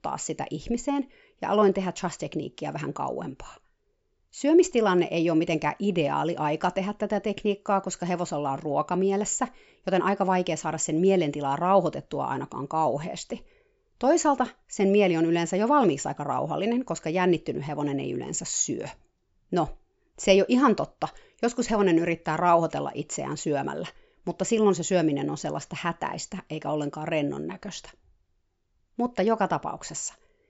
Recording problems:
high frequencies cut off; noticeable; nothing above 8 kHz

